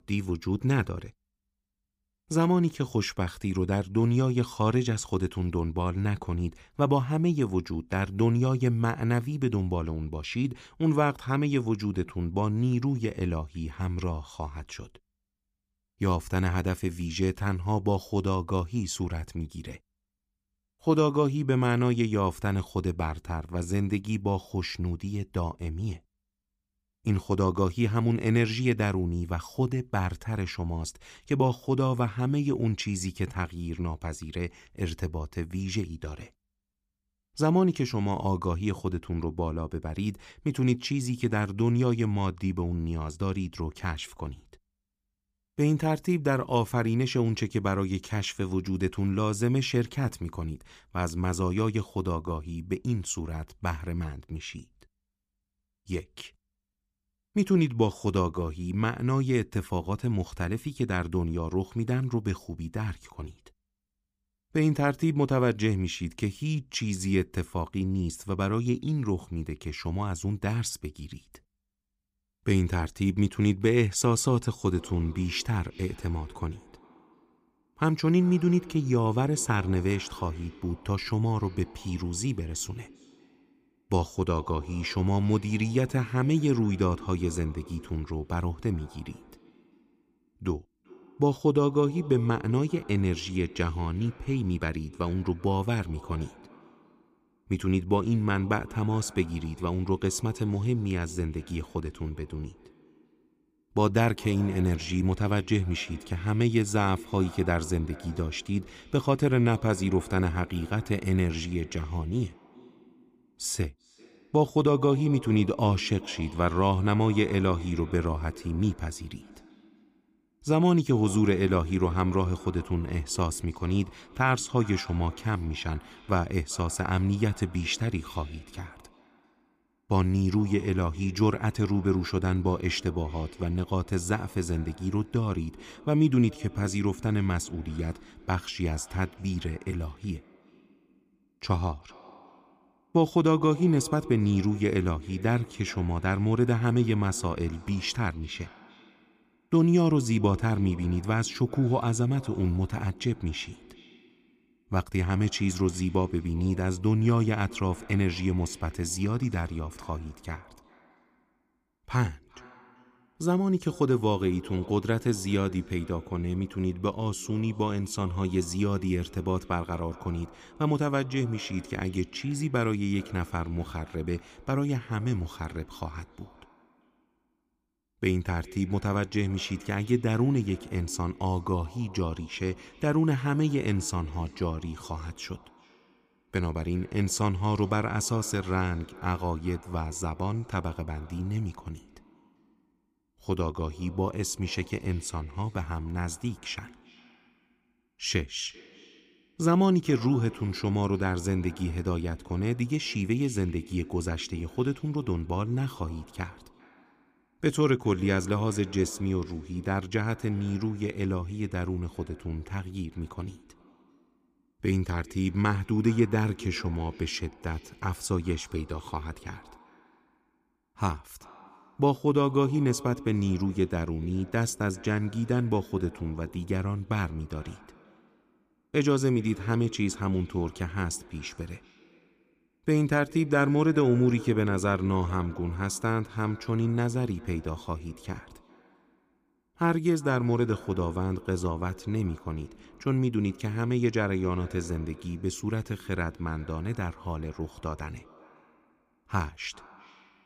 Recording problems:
echo of what is said; faint; from 1:15 on; 390 ms later, 20 dB below the speech

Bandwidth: 15 kHz